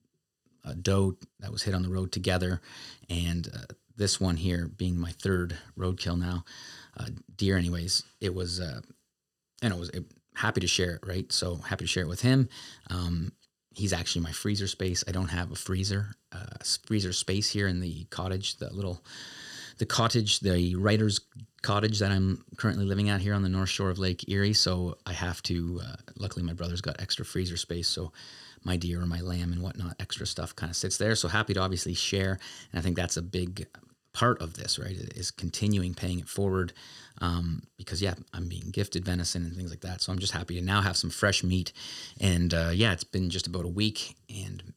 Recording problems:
none

